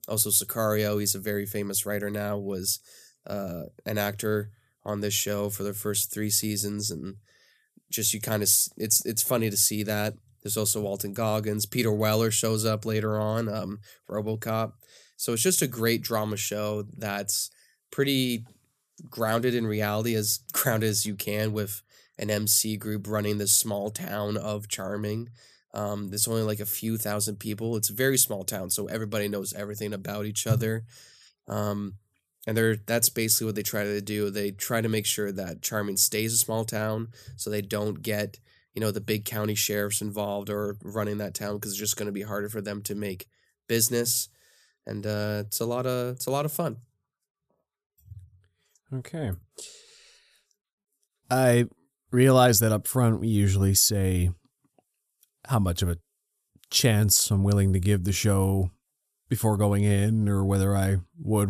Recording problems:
abrupt cut into speech; at the end

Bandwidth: 14.5 kHz